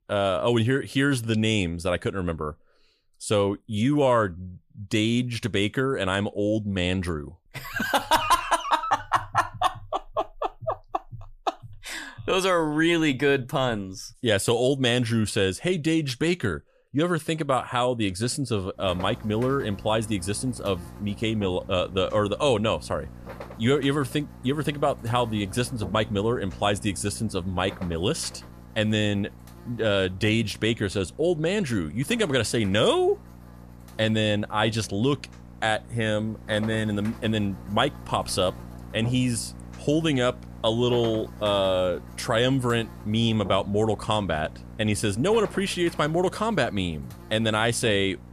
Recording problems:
electrical hum; faint; from 19 s on; 60 Hz, 20 dB below the speech

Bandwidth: 14.5 kHz